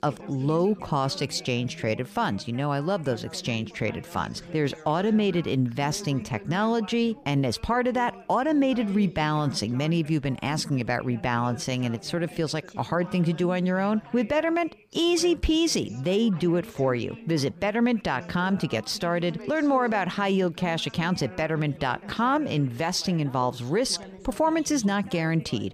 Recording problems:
background chatter; noticeable; throughout; 3 voices, 20 dB below the speech

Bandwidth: 15 kHz